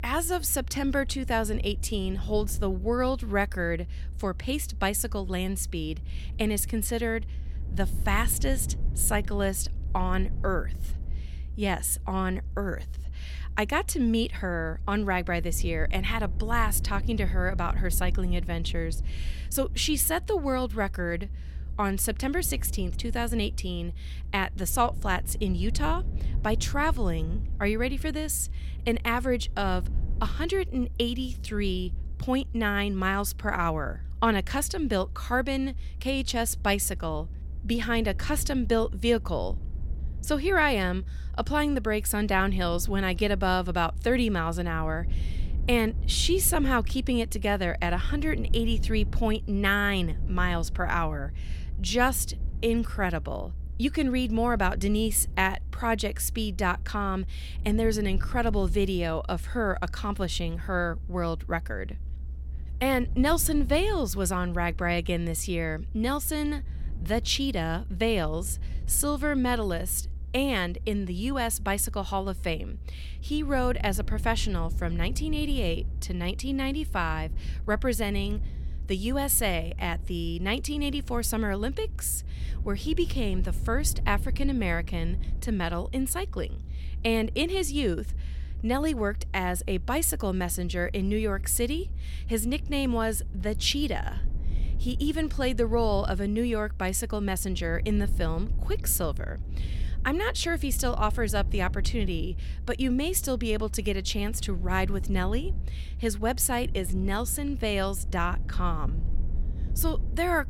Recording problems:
low rumble; faint; throughout; 25 dB below the speech

